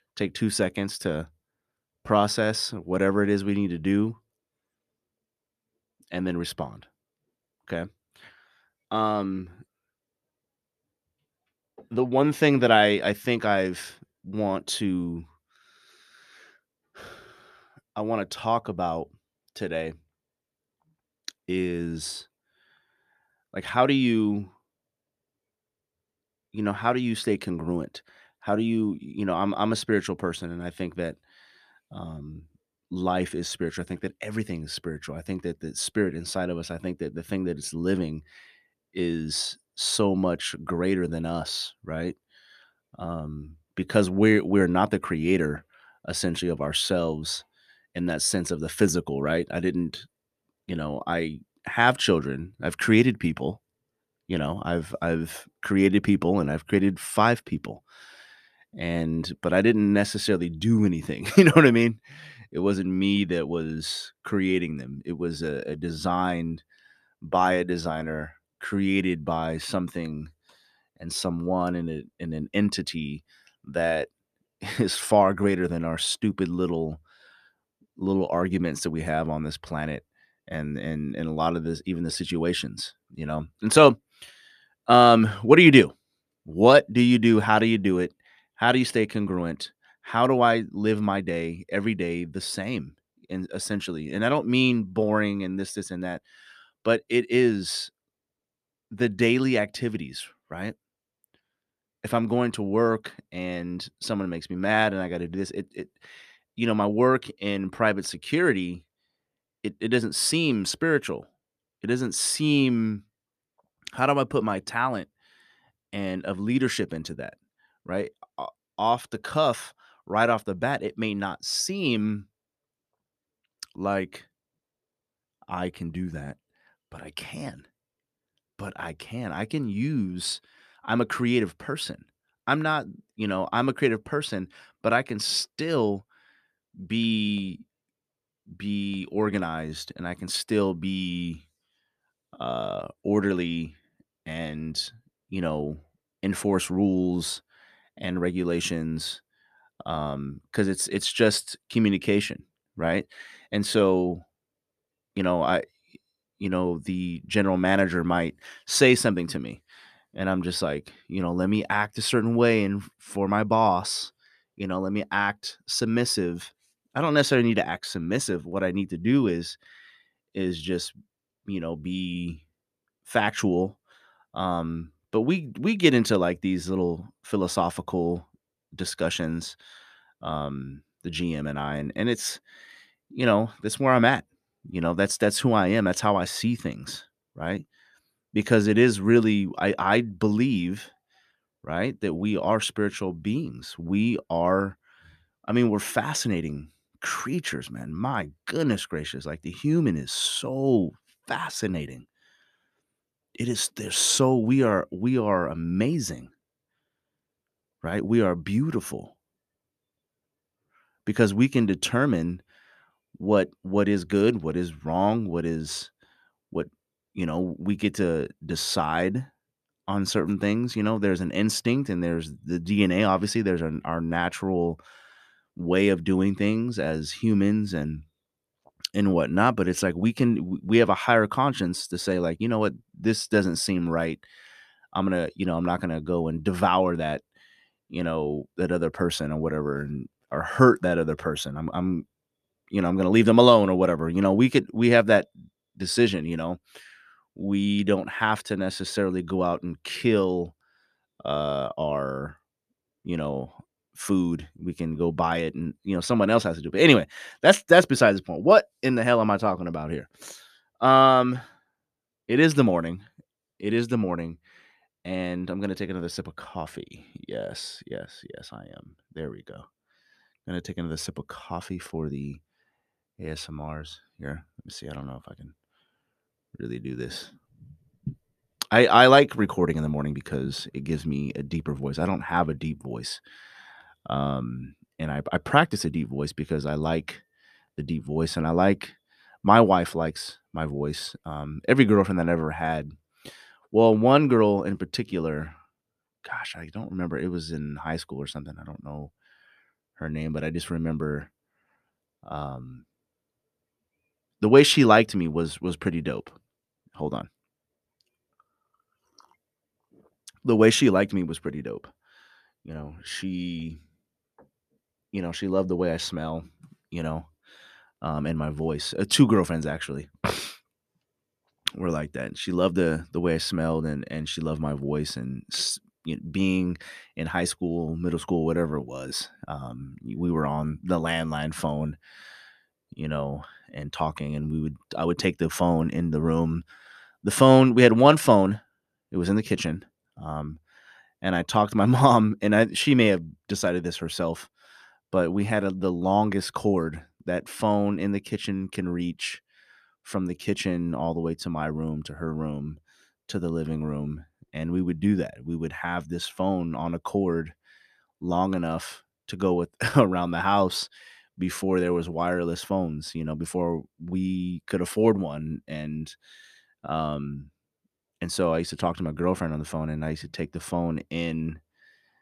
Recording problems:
none

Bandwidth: 14.5 kHz